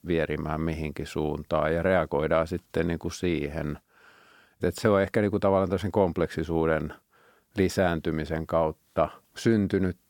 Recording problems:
none

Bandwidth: 17.5 kHz